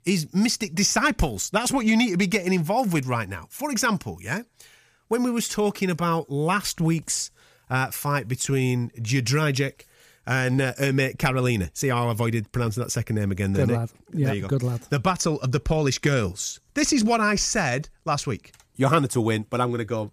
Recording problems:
none

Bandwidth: 15 kHz